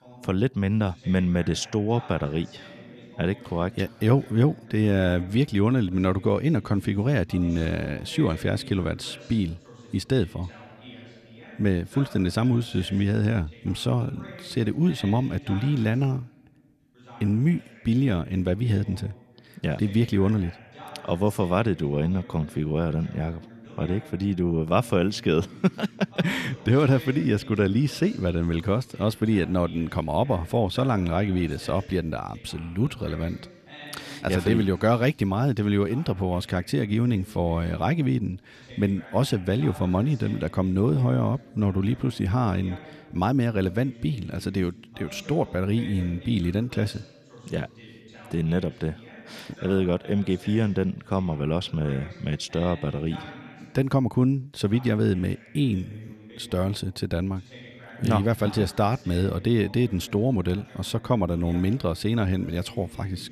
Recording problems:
voice in the background; noticeable; throughout; 20 dB below the speech

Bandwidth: 14.5 kHz